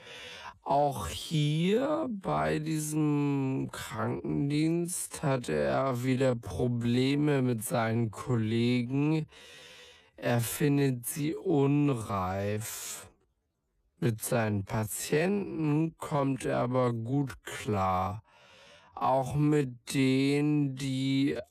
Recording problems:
wrong speed, natural pitch; too slow; 0.5 times normal speed

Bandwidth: 14.5 kHz